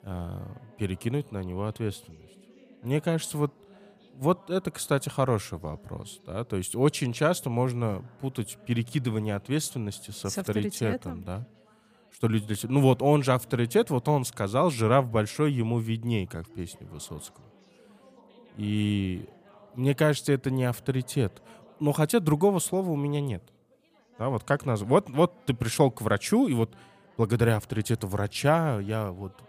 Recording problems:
background chatter; faint; throughout; 3 voices, 30 dB below the speech

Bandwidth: 15 kHz